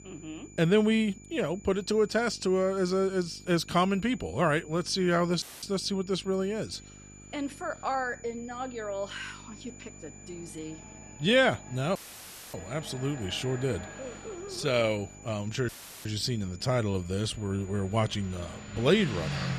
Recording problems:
traffic noise; noticeable; throughout; 15 dB below the speech
electrical hum; faint; throughout; 50 Hz, 30 dB below the speech
high-pitched whine; faint; throughout; 7 kHz, 20 dB below the speech
audio cutting out; filled with static; at 5.5 s, at 12 s for 0.5 s and at 16 s
uneven, jittery; strongly; from 8 to 18 s

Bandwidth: 13.5 kHz